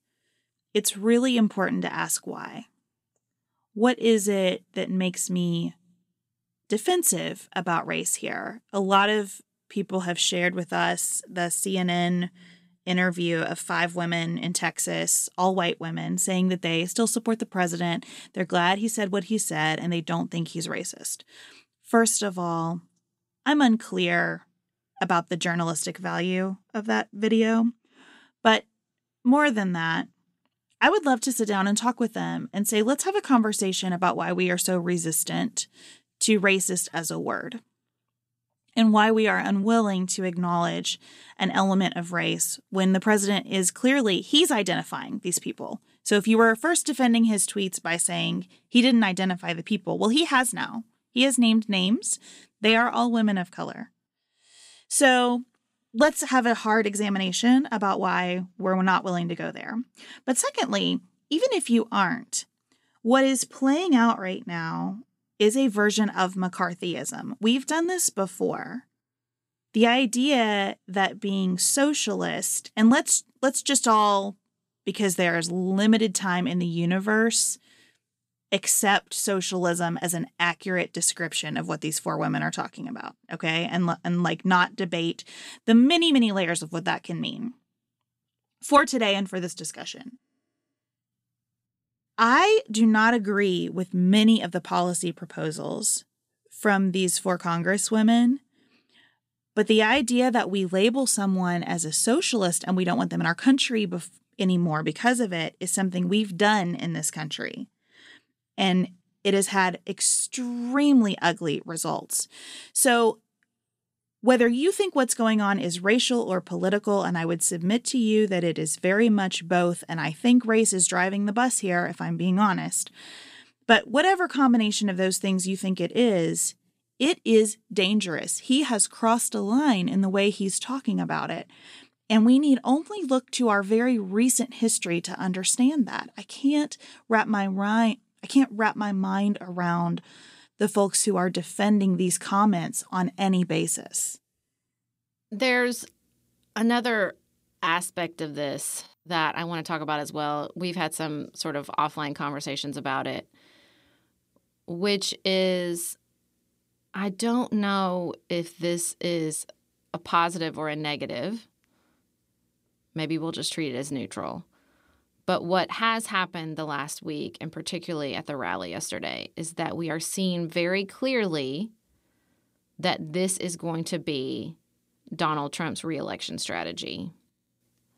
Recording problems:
none

